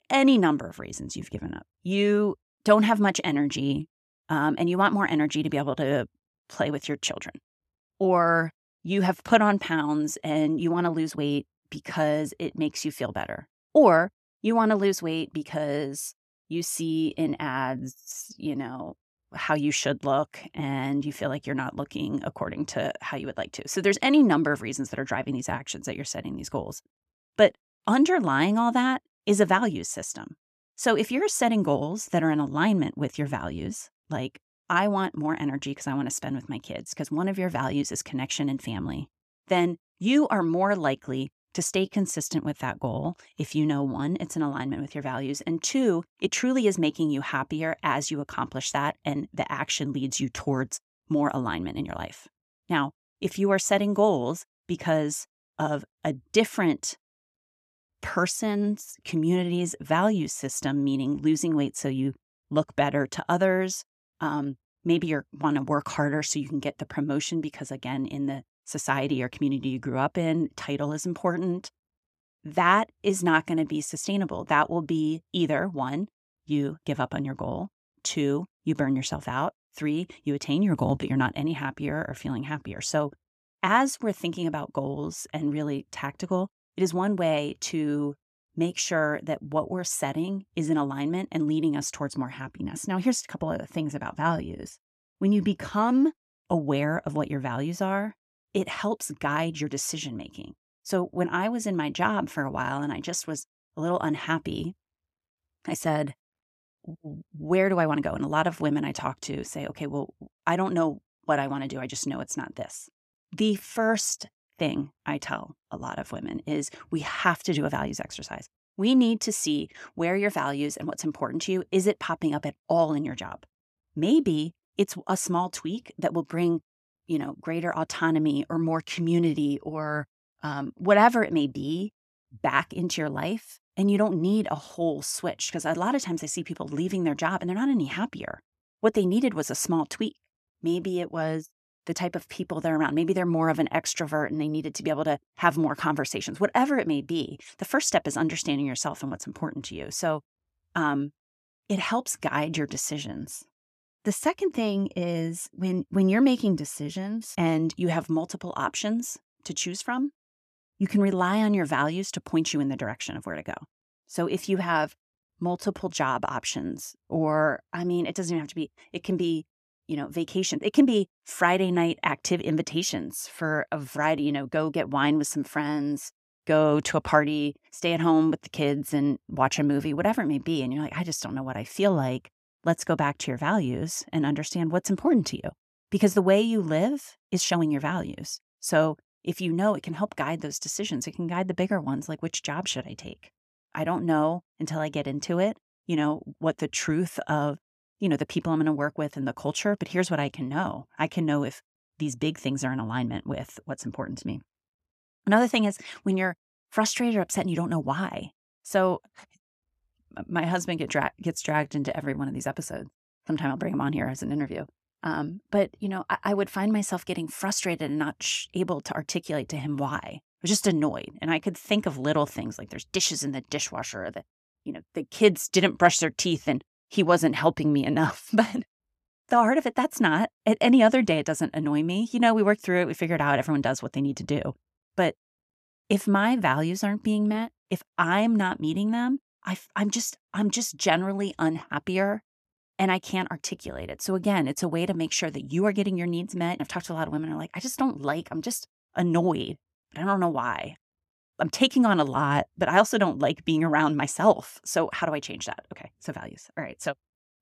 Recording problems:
uneven, jittery; strongly; from 10 s to 3:32

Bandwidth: 14 kHz